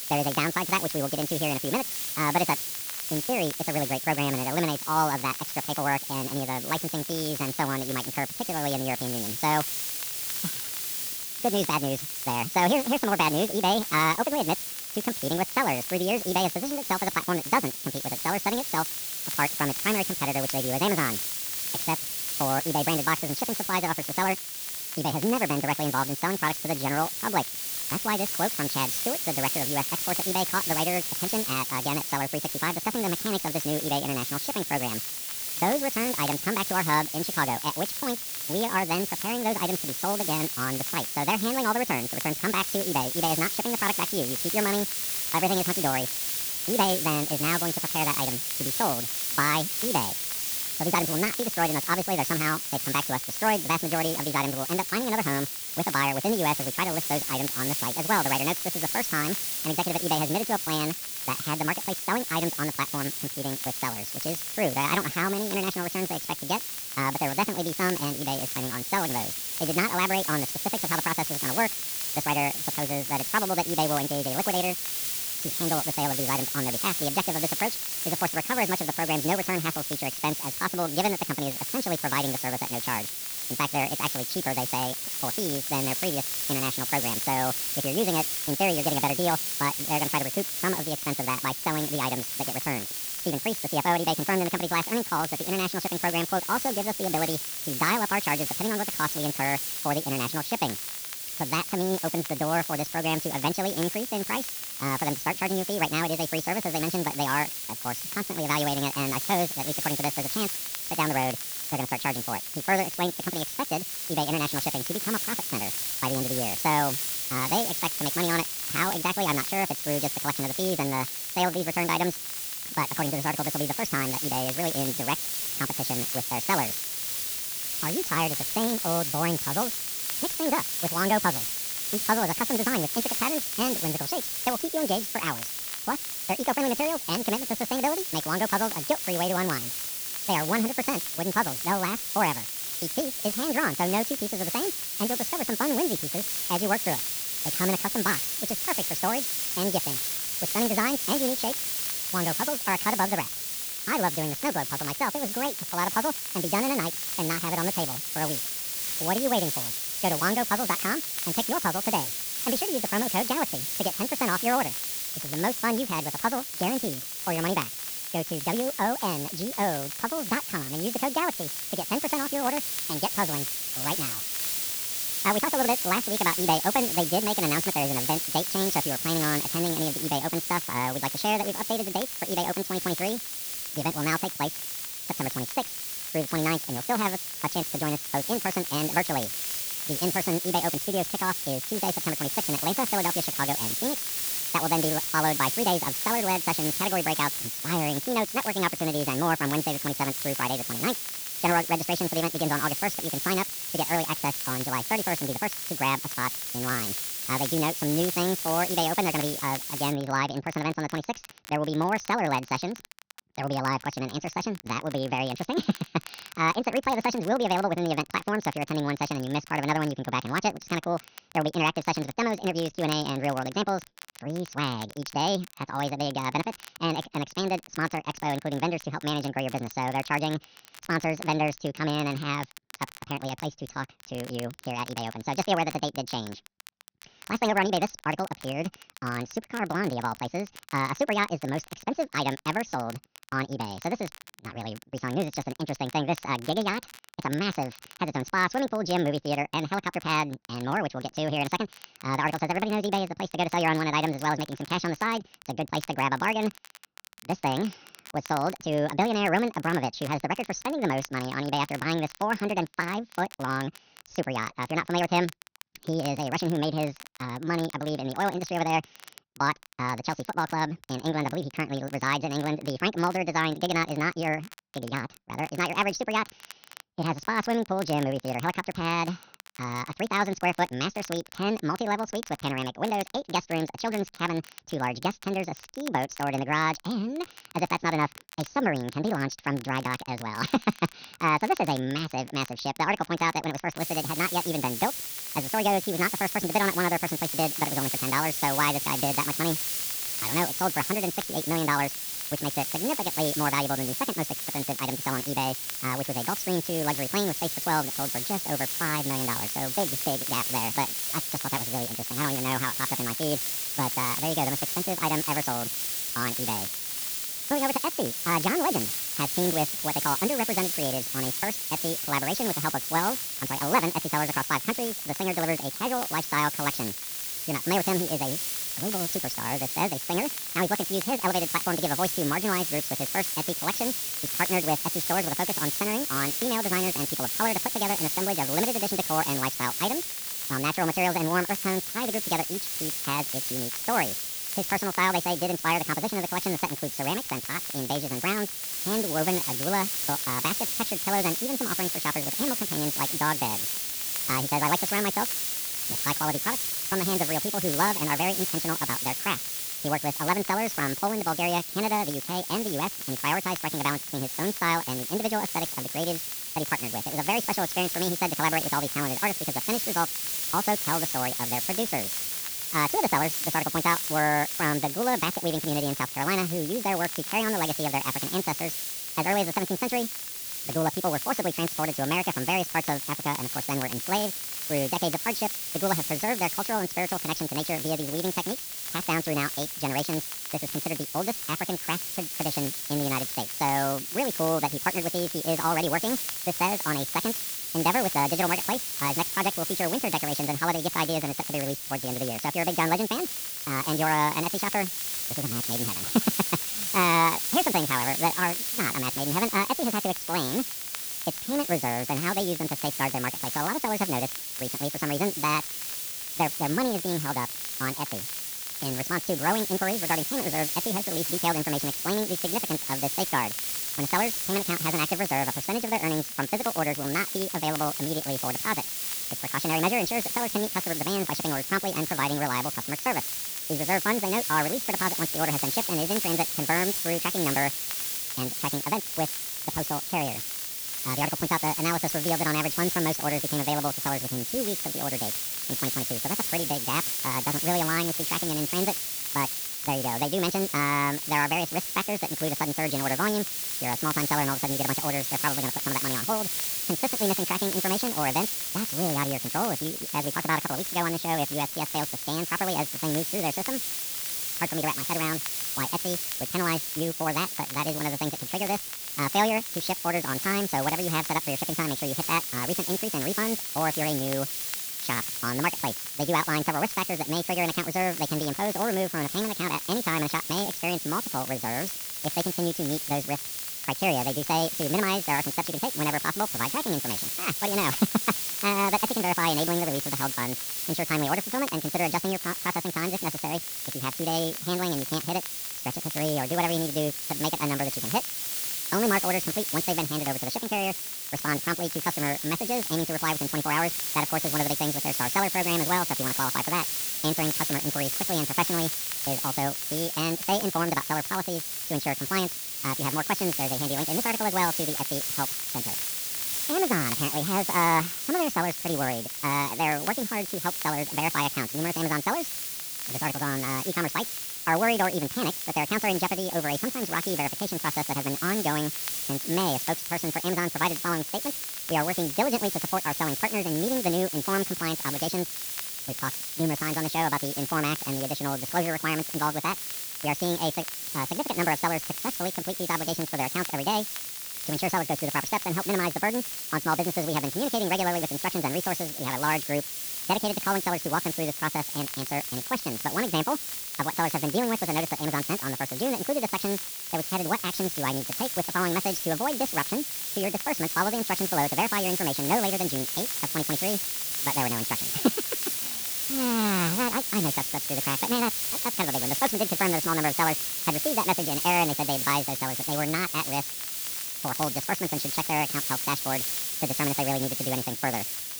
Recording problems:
wrong speed and pitch; too fast and too high; 1.6 times normal speed
high frequencies cut off; noticeable; nothing above 6.5 kHz
hiss; loud; until 3:30 and from 4:54 on; 1 dB below the speech
crackle, like an old record; noticeable; 20 dB below the speech

